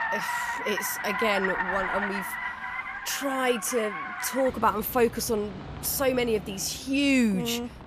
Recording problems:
traffic noise; loud; throughout; 5 dB below the speech

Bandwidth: 14.5 kHz